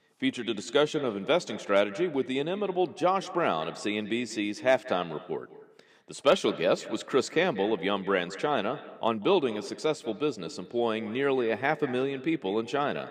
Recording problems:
echo of what is said; noticeable; throughout; 190 ms later, 15 dB below the speech

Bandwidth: 15 kHz